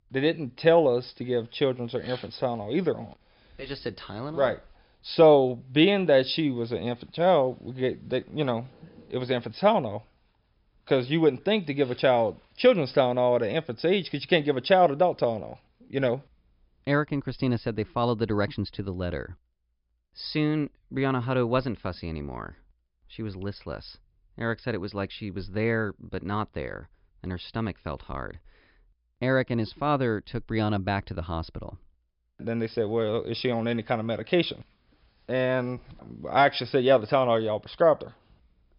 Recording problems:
high frequencies cut off; noticeable; nothing above 5.5 kHz

